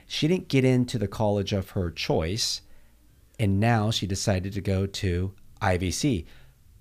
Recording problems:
none

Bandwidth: 15 kHz